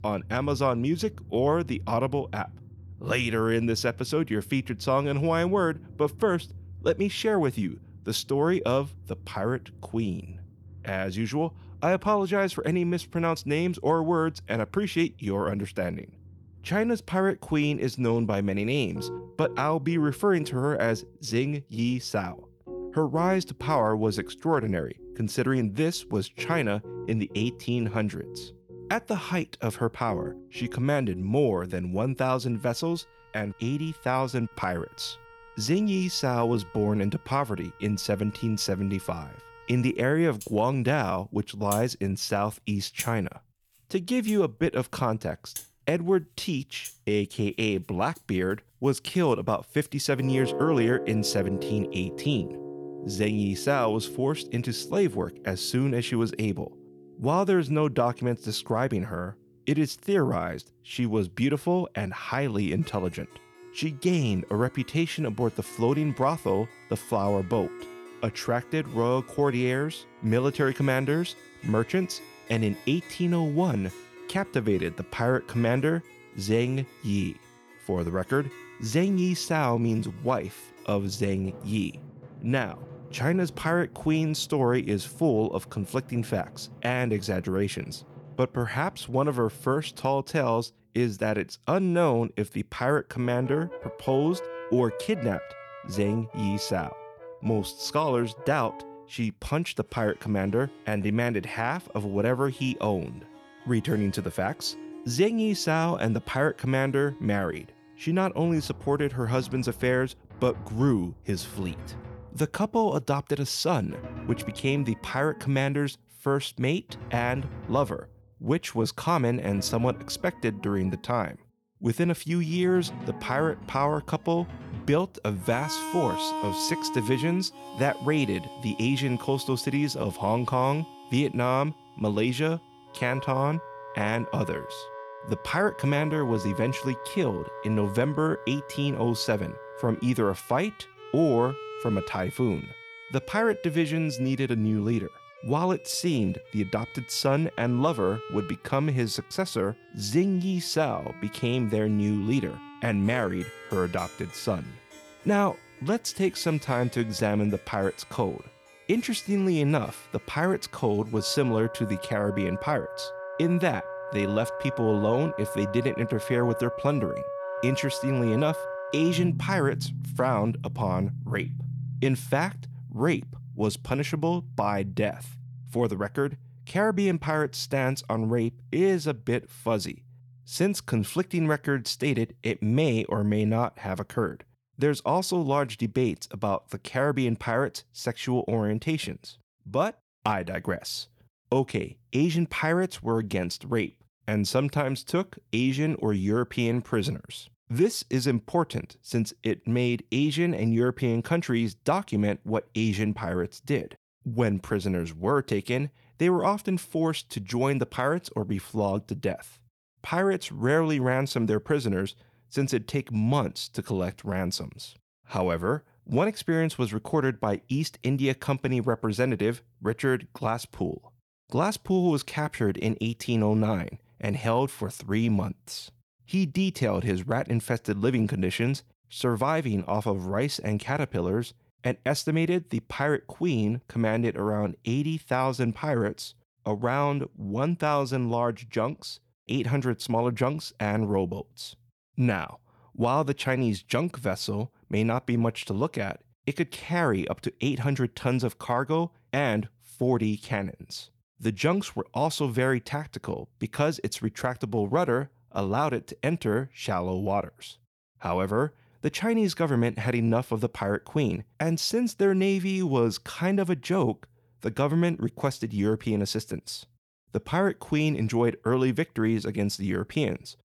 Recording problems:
background music; noticeable; until 3:04; 15 dB below the speech

